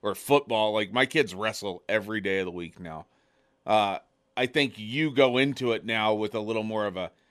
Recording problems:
none

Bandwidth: 13.5 kHz